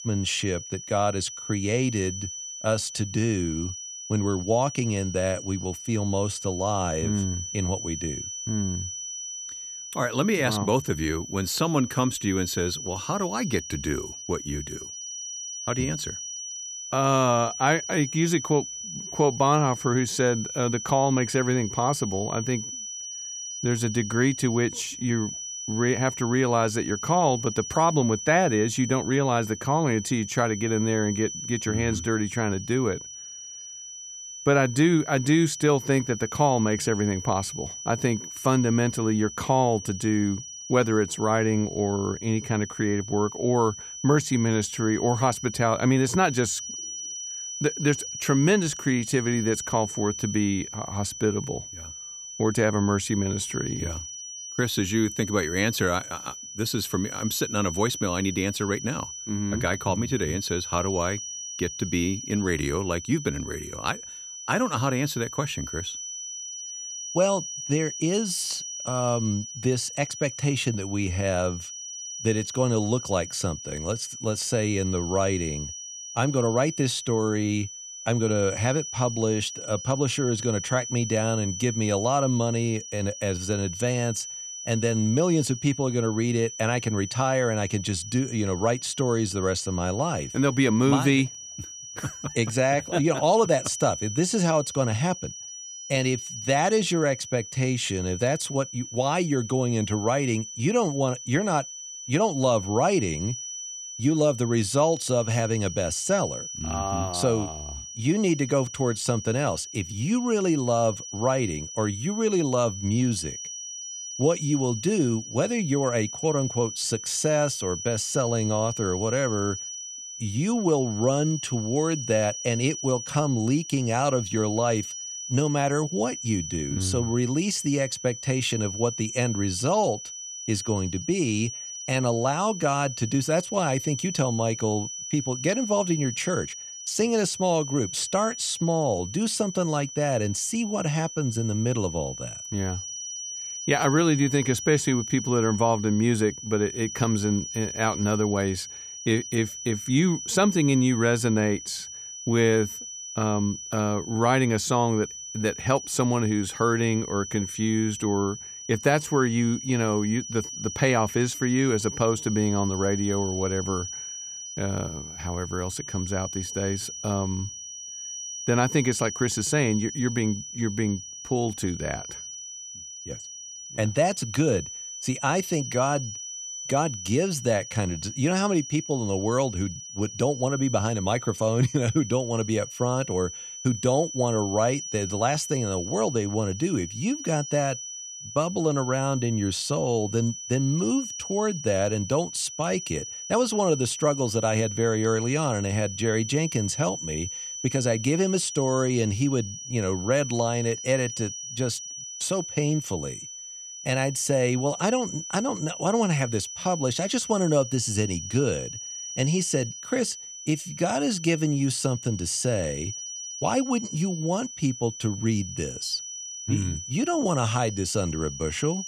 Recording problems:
high-pitched whine; loud; throughout; 6 kHz, 9 dB below the speech

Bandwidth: 14.5 kHz